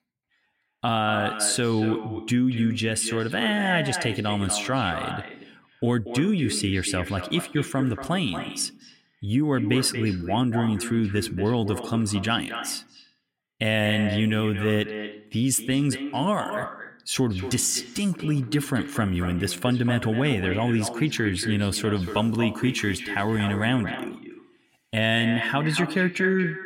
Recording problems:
echo of what is said; strong; throughout; 230 ms later, 9 dB below the speech

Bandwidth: 16.5 kHz